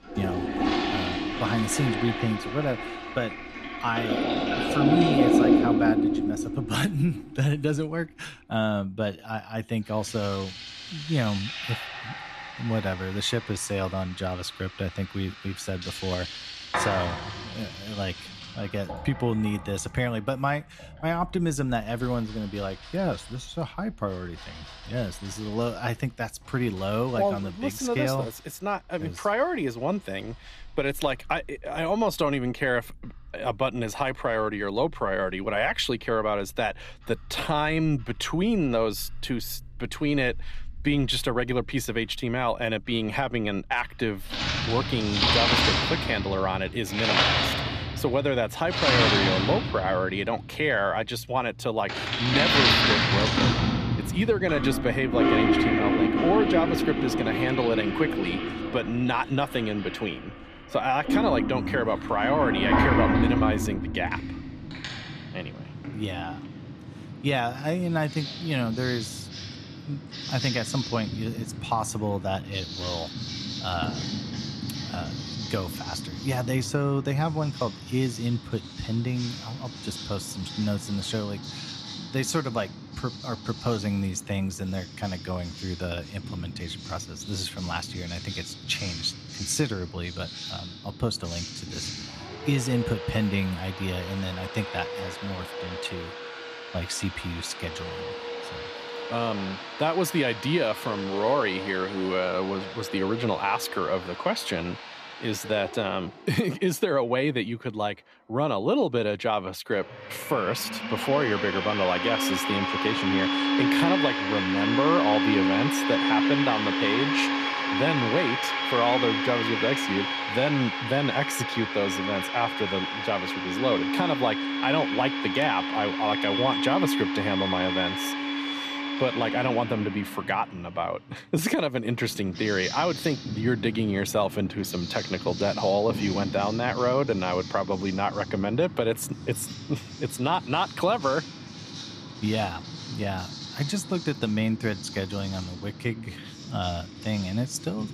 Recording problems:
household noises; loud; throughout; 1 dB below the speech

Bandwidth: 14.5 kHz